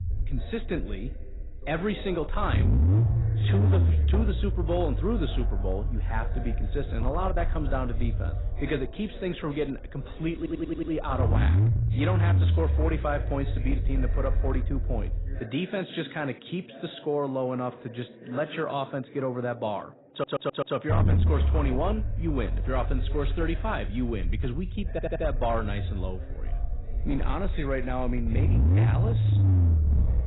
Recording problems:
garbled, watery; badly; nothing above 4 kHz
distortion; slight; 8% of the sound clipped
low rumble; loud; until 15 s and from 21 s on; 8 dB below the speech
voice in the background; noticeable; throughout; 15 dB below the speech
audio stuttering; at 10 s, at 20 s and at 25 s

